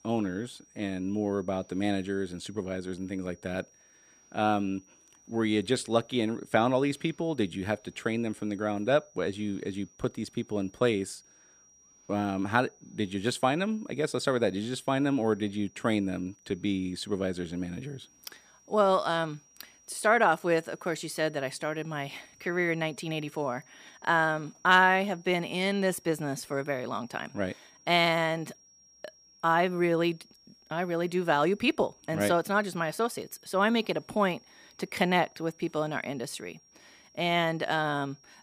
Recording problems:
high-pitched whine; faint; throughout; 6 kHz, 30 dB below the speech

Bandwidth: 14.5 kHz